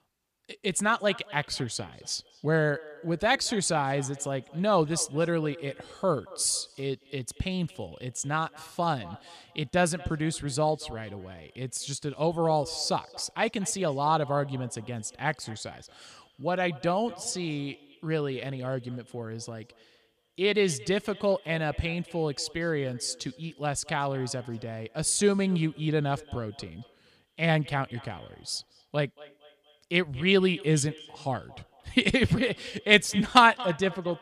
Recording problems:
echo of what is said; faint; throughout; 230 ms later, 20 dB below the speech

